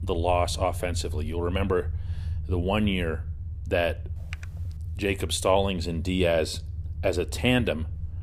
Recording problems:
low rumble; faint; throughout; 25 dB below the speech
keyboard typing; faint; at 4 s; peak 15 dB below the speech

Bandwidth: 15.5 kHz